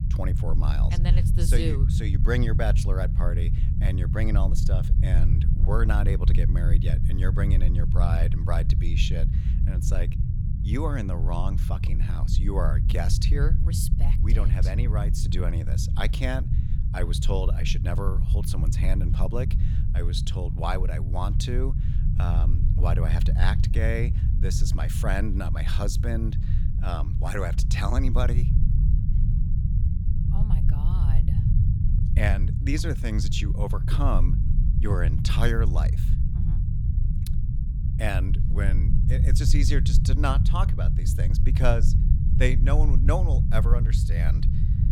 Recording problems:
low rumble; loud; throughout; 6 dB below the speech

